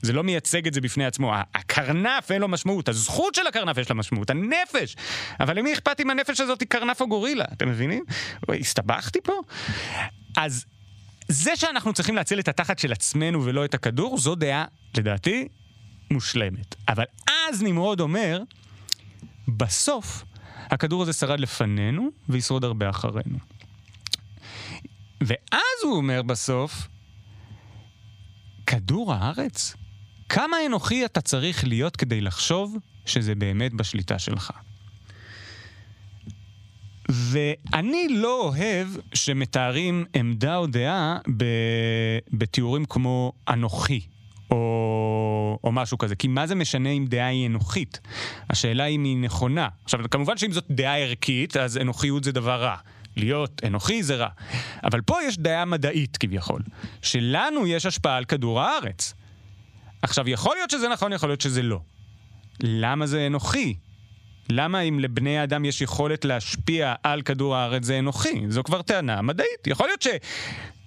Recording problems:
squashed, flat; heavily

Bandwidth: 15 kHz